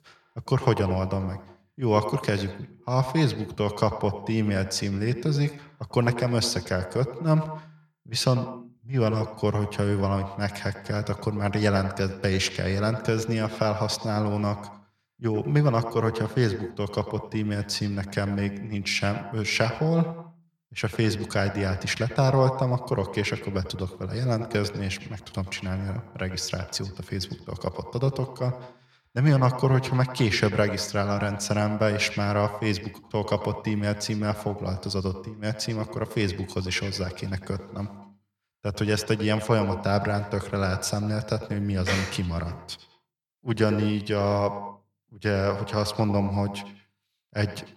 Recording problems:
echo of what is said; strong; throughout; 90 ms later, 10 dB below the speech

